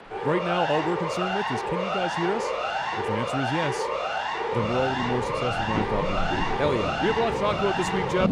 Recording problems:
rain or running water; loud; throughout; 9 dB below the speech
siren; loud; peak 2 dB above the speech

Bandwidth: 15.5 kHz